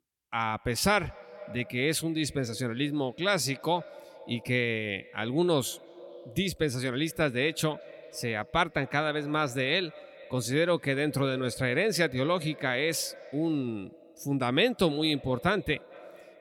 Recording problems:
echo of what is said; faint; throughout; 220 ms later, 20 dB below the speech

